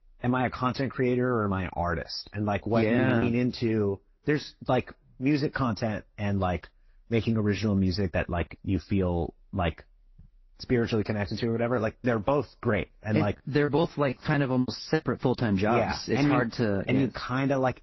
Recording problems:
garbled, watery; slightly; nothing above 5.5 kHz
choppy; very; from 2 to 3 s and from 14 to 15 s; 13% of the speech affected

